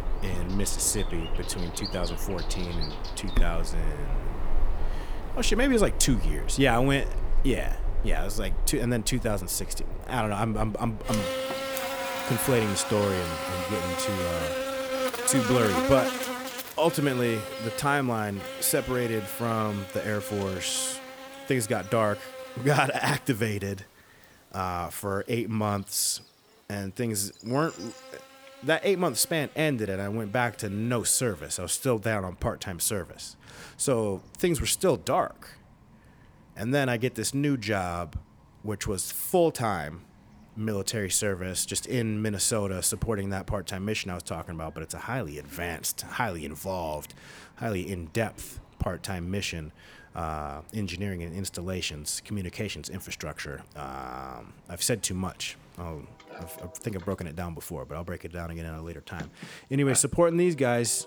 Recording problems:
animal sounds; loud; throughout; 6 dB below the speech

